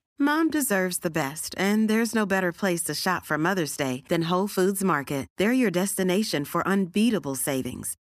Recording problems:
none

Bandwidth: 14.5 kHz